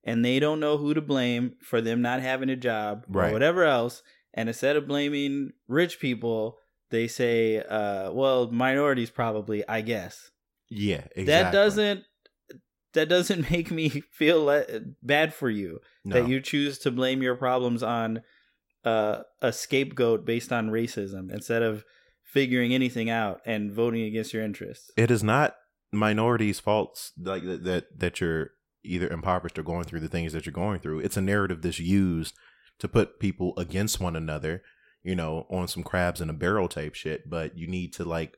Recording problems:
none

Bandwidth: 16.5 kHz